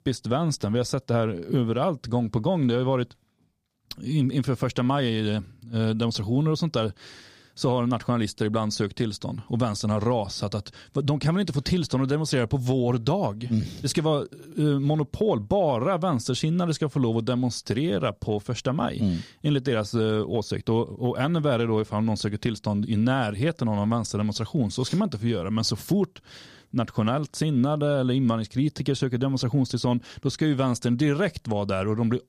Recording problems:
none

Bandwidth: 15 kHz